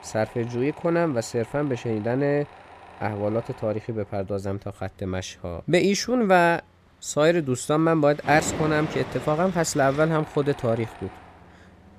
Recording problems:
machinery noise; noticeable; throughout; 15 dB below the speech

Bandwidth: 15 kHz